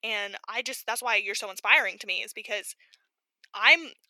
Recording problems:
thin; very; fading below 450 Hz

